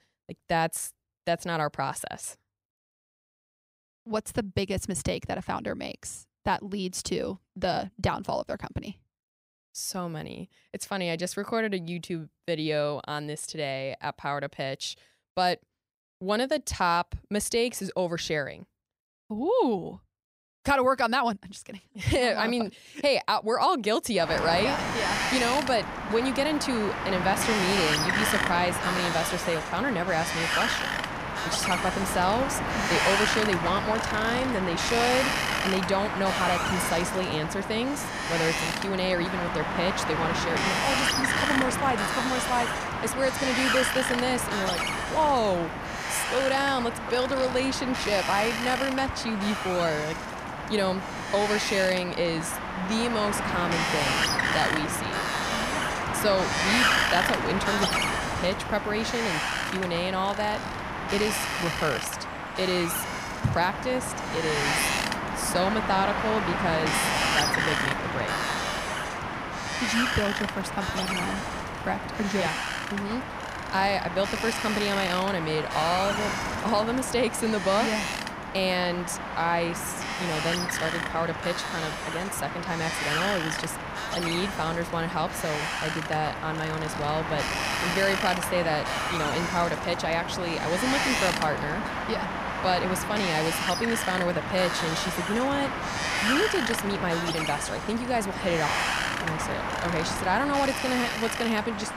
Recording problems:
wind noise on the microphone; heavy; from 24 s on; 1 dB above the speech

